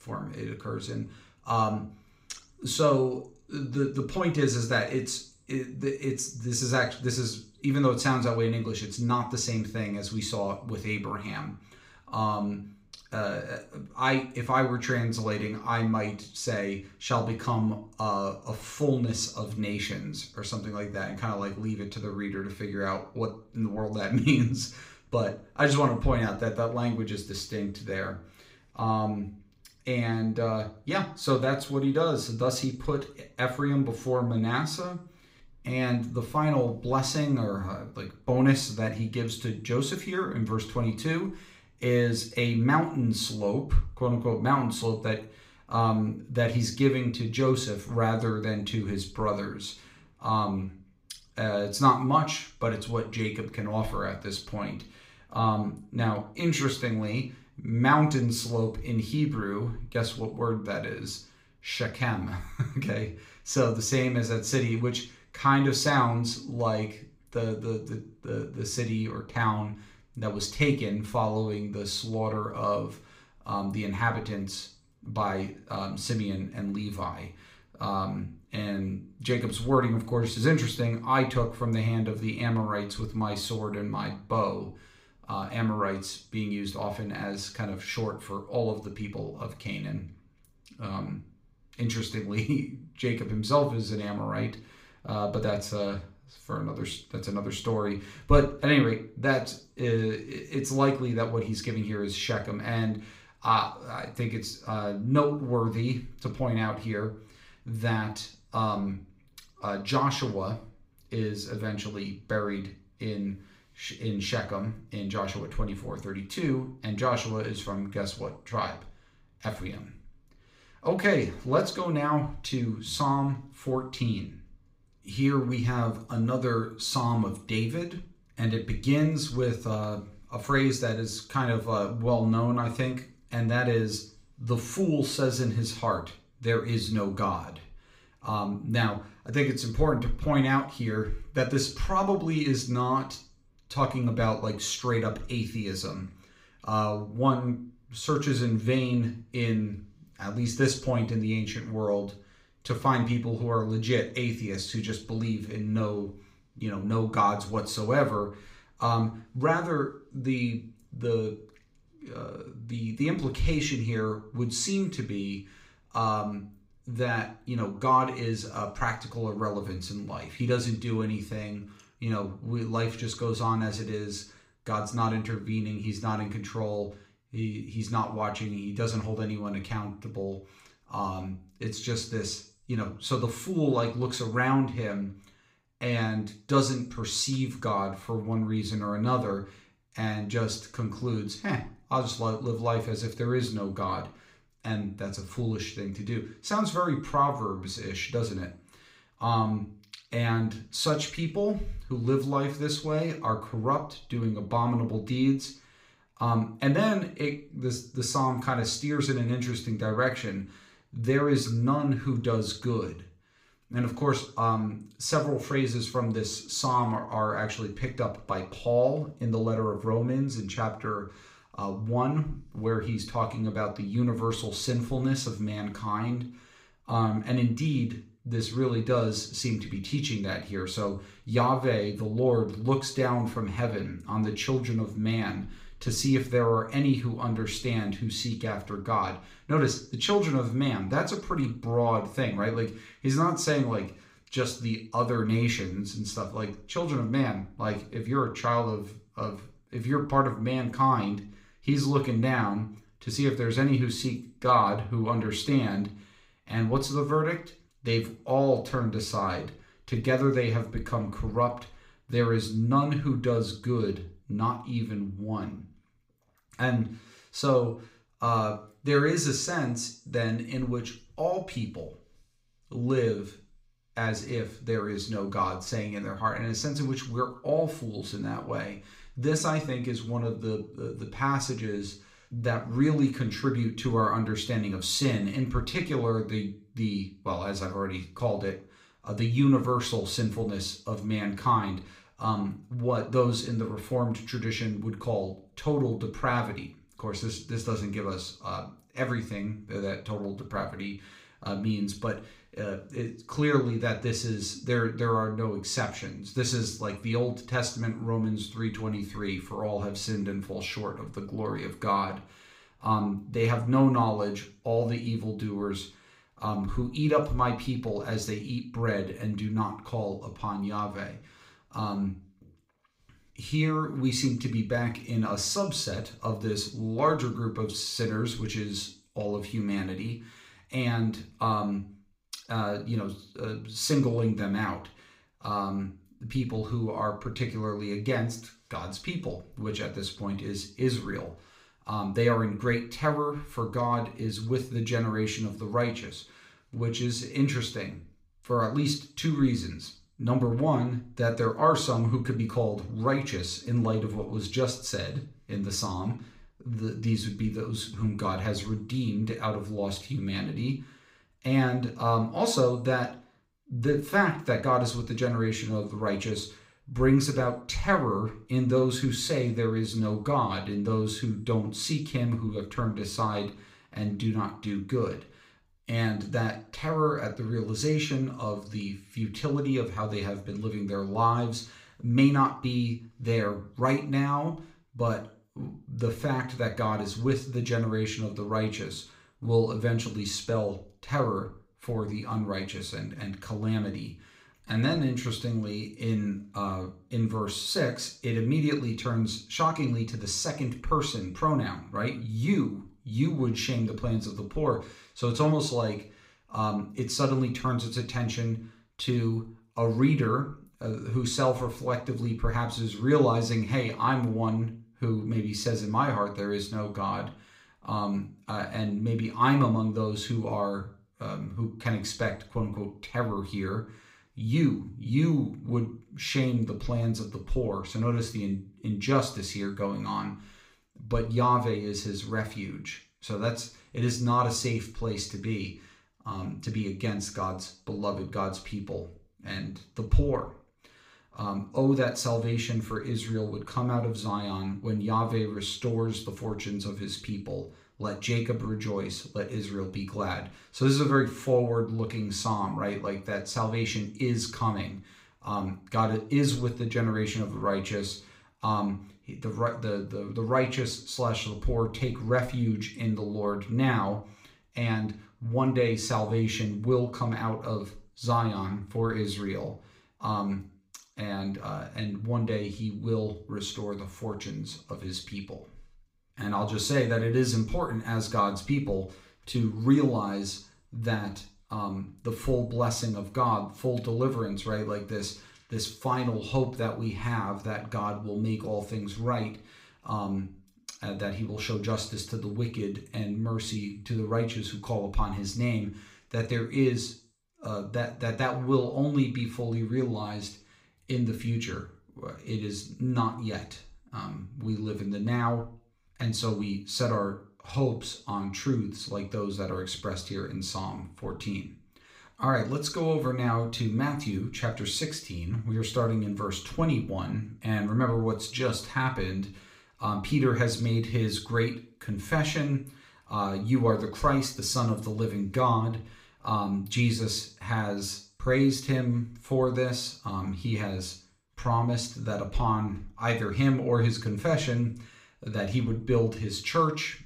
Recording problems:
room echo; very slight; dies away in 0.4 s
off-mic speech; somewhat distant

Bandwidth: 15.5 kHz